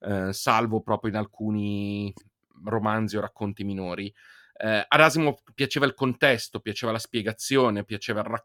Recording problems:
none

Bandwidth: 18.5 kHz